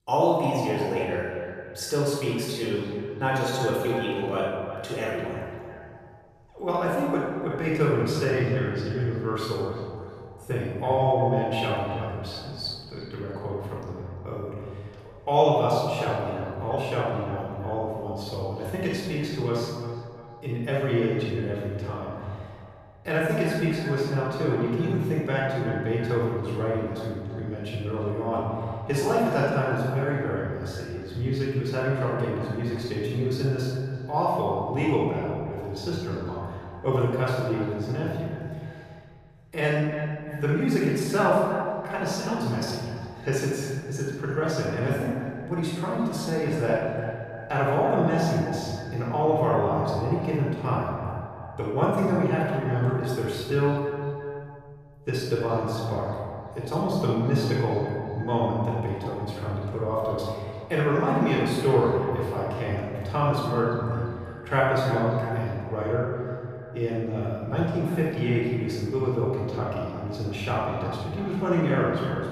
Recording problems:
room echo; strong; dies away in 1.6 s
off-mic speech; far
echo of what is said; noticeable; throughout; 340 ms later, 15 dB below the speech

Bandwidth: 14.5 kHz